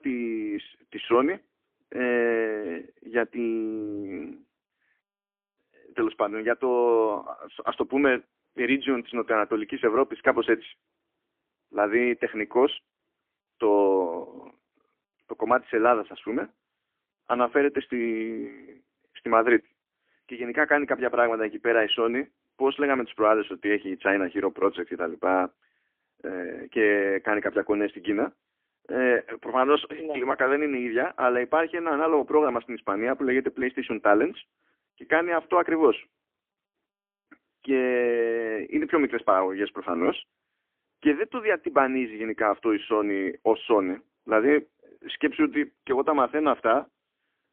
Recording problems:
phone-call audio; poor line; nothing above 3.5 kHz

